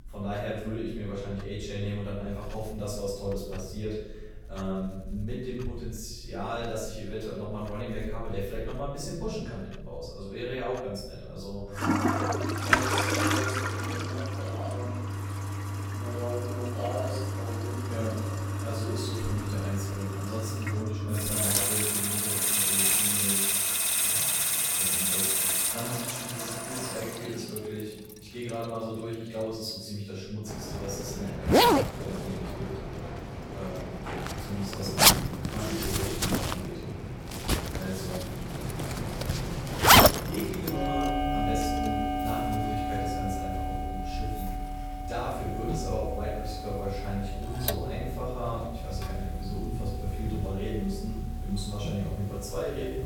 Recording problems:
off-mic speech; far
room echo; noticeable; dies away in 1 s
household noises; very loud; throughout; 8 dB above the speech

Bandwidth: 17 kHz